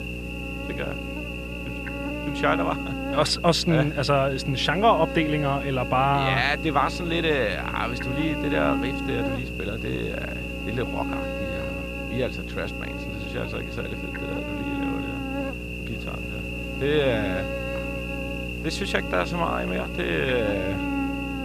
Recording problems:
electrical hum; loud; throughout; 60 Hz, 6 dB below the speech

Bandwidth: 14.5 kHz